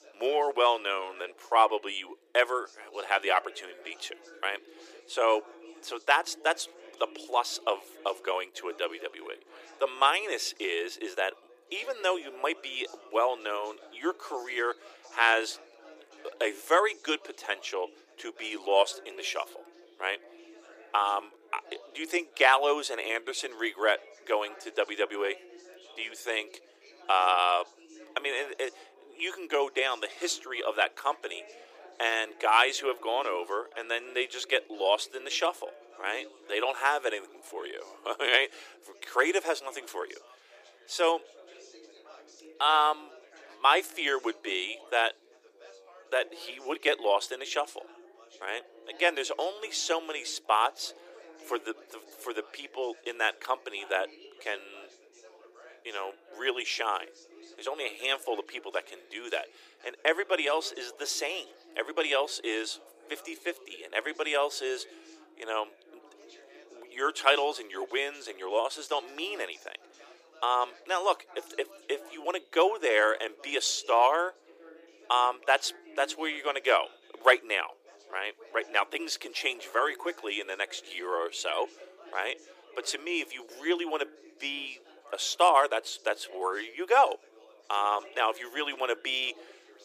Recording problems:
thin; very; fading below 350 Hz
background chatter; faint; throughout; 4 voices, 25 dB below the speech

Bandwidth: 15 kHz